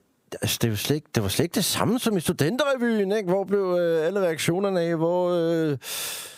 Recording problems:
squashed, flat; heavily

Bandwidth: 15.5 kHz